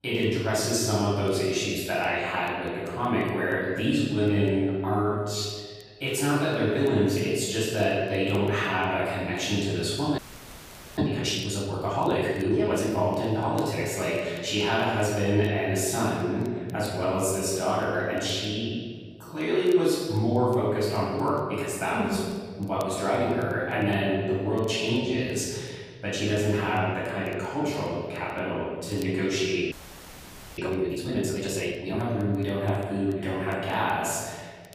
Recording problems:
room echo; strong; dies away in 1.6 s
off-mic speech; far
crackle, like an old record; very faint; 30 dB below the speech
audio freezing; at 10 s for 1 s and at 30 s for 1 s

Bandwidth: 15 kHz